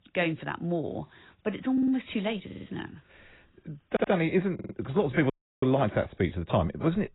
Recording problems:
garbled, watery; badly; nothing above 4 kHz
audio stuttering; 4 times, first at 1.5 s
audio cutting out; at 5.5 s

